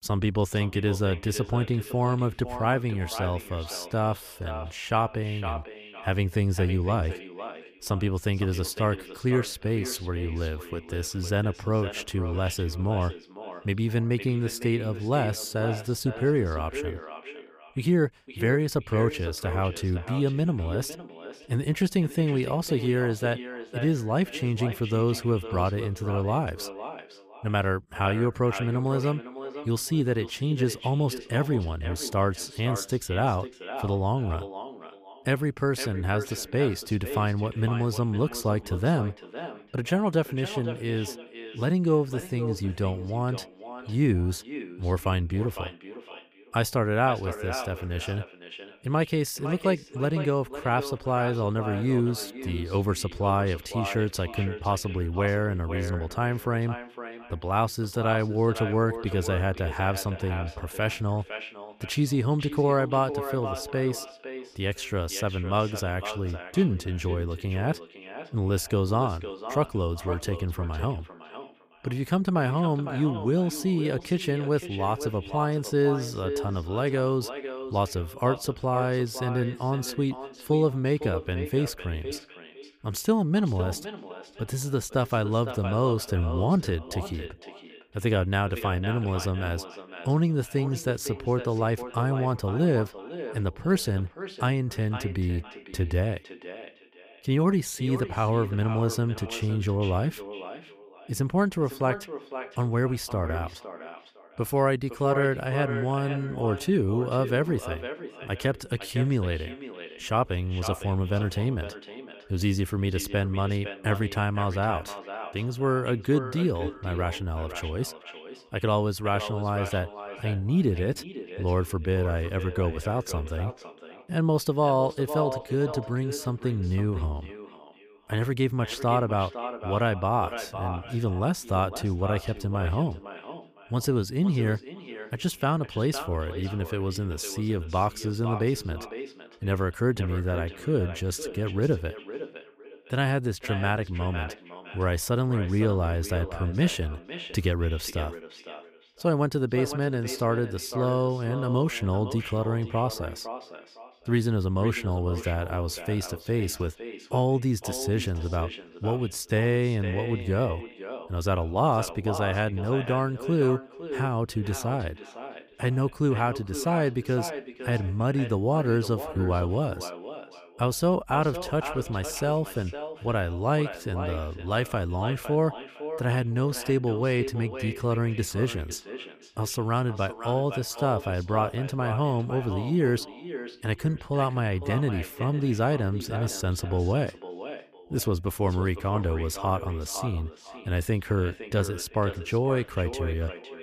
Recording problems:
echo of what is said; strong; throughout; 510 ms later, 10 dB below the speech

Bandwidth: 15 kHz